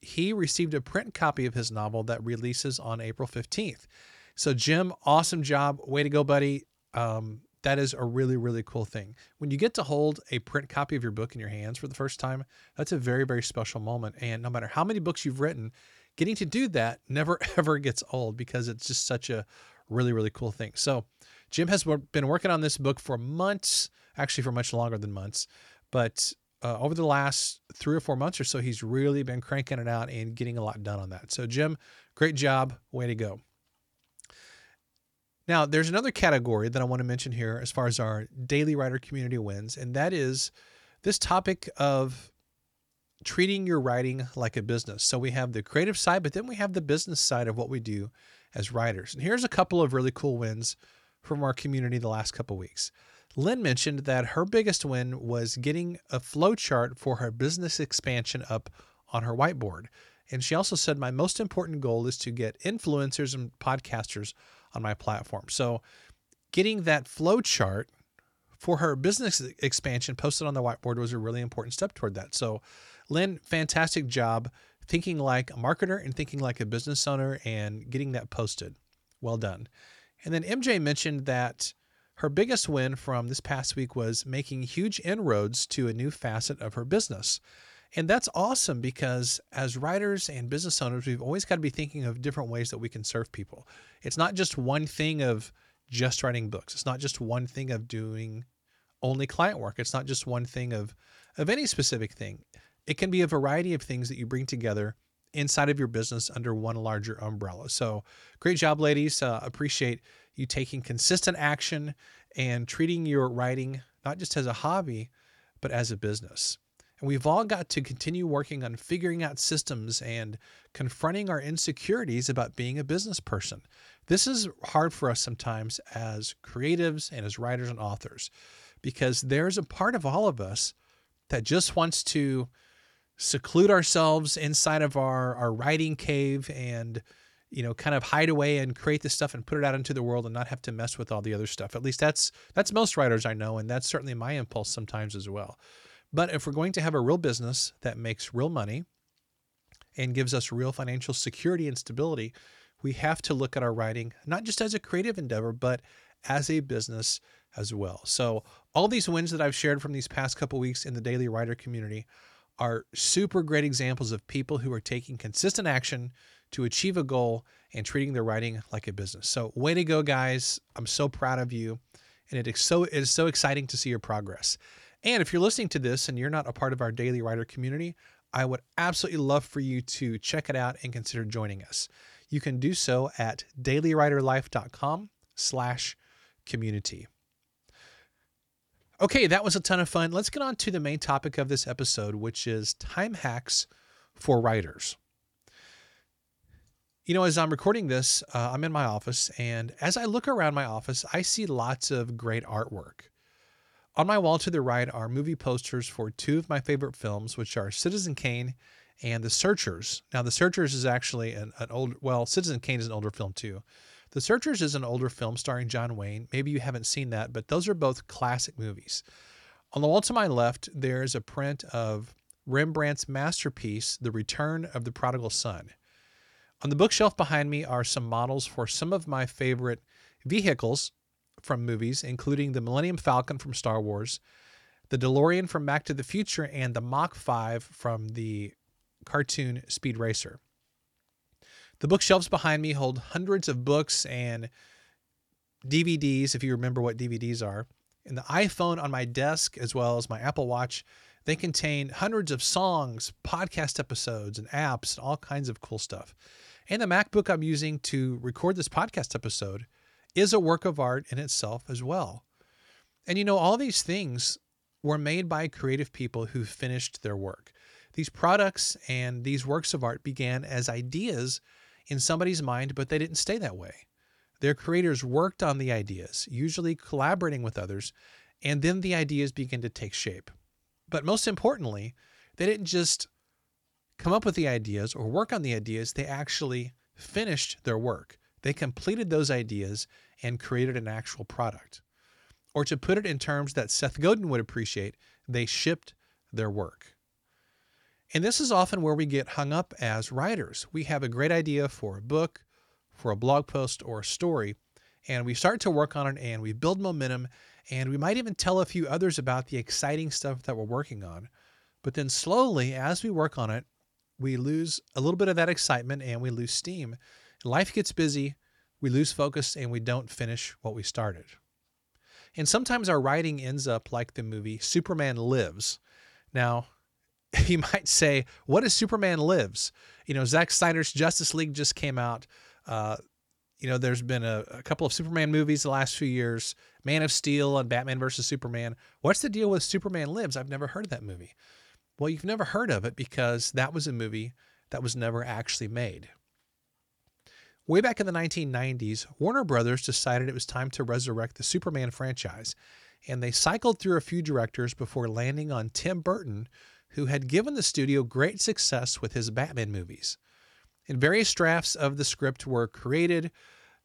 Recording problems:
none

